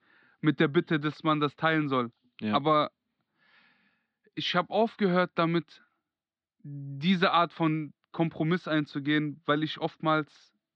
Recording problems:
muffled; slightly; fading above 4 kHz

